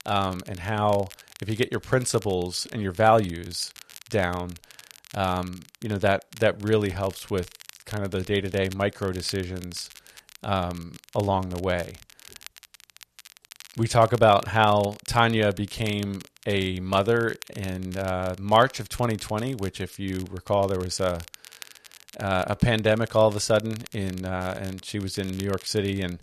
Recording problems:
crackle, like an old record; faint; 20 dB below the speech

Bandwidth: 13.5 kHz